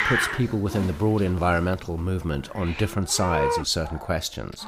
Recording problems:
animal sounds; loud; throughout; 4 dB below the speech

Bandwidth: 15.5 kHz